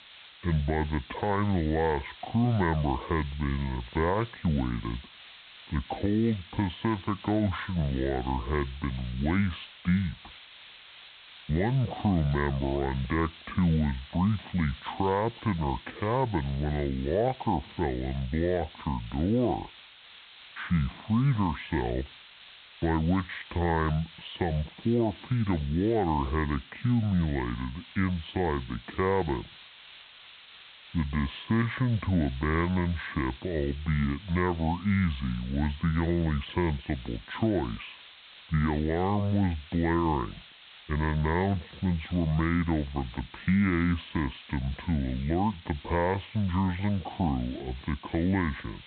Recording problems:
high frequencies cut off; severe; nothing above 4 kHz
wrong speed and pitch; too slow and too low; 0.6 times normal speed
hiss; noticeable; throughout; 20 dB below the speech

